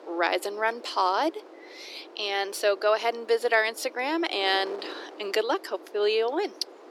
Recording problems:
thin; very; fading below 300 Hz
wind noise on the microphone; occasional gusts; 20 dB below the speech

